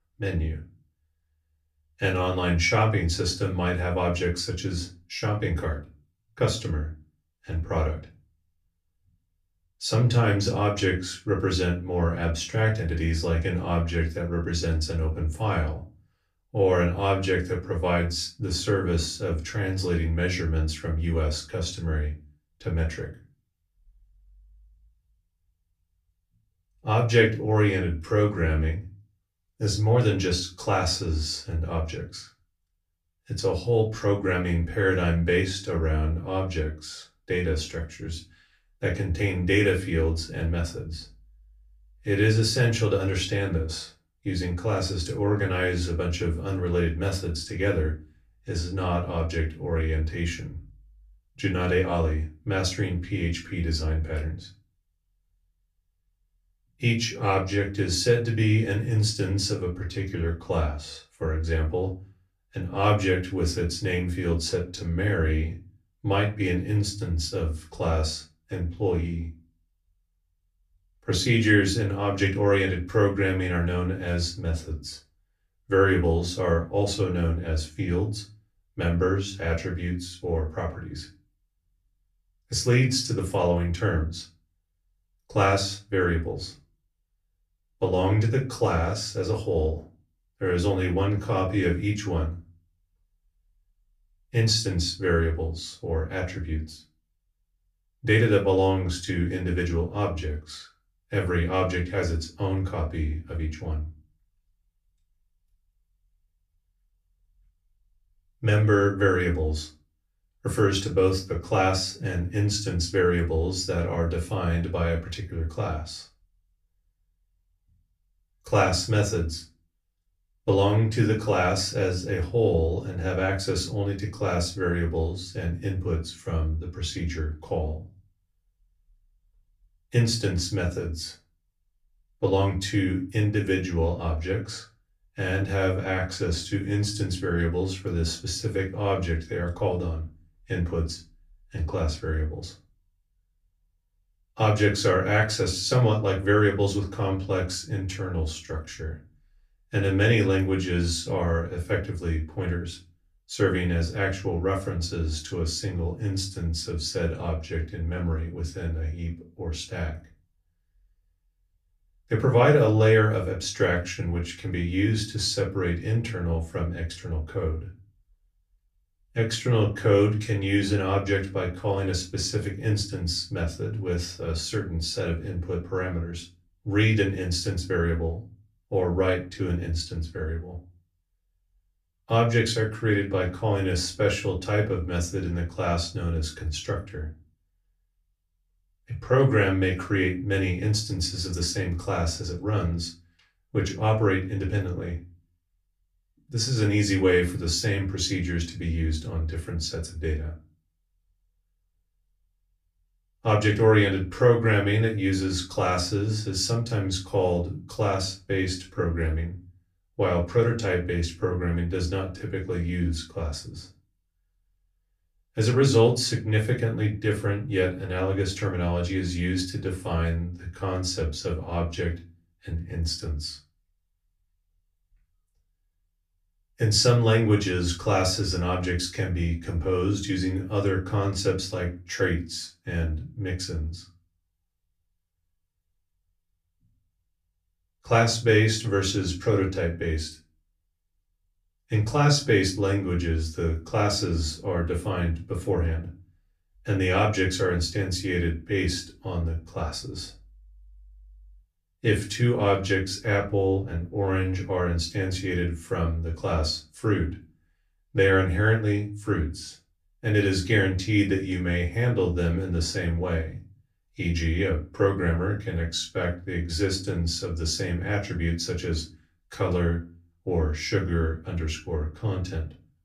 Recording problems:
off-mic speech; far
room echo; very slight; dies away in 0.3 s

